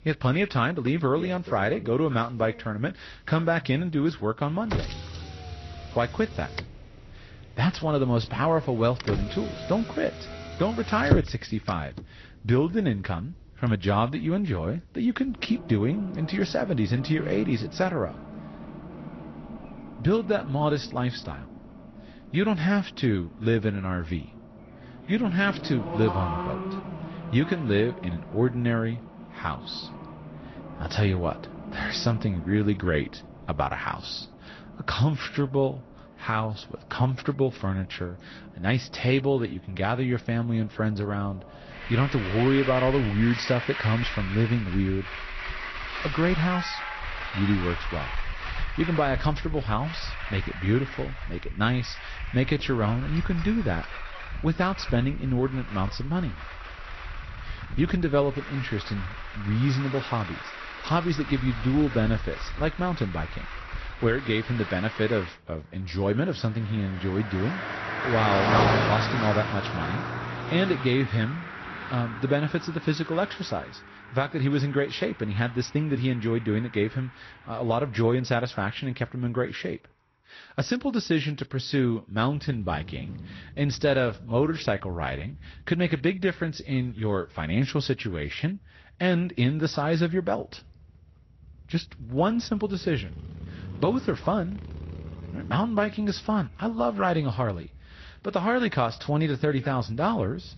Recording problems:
garbled, watery; slightly; nothing above 6 kHz
traffic noise; loud; throughout; 8 dB below the speech

